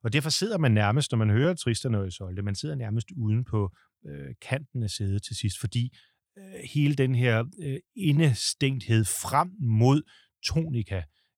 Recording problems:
none

